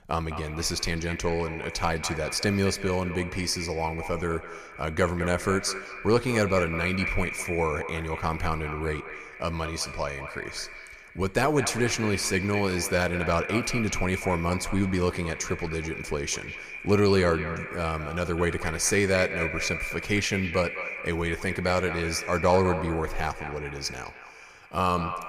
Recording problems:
echo of what is said; strong; throughout; 210 ms later, 8 dB below the speech

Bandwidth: 15 kHz